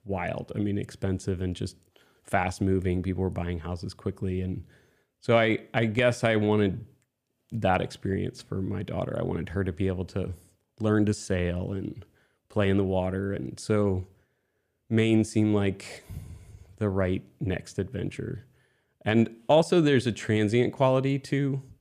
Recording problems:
none

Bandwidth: 15 kHz